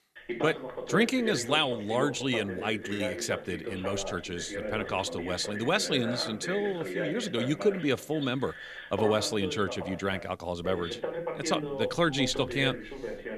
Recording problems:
voice in the background; loud; throughout; 7 dB below the speech

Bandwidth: 14 kHz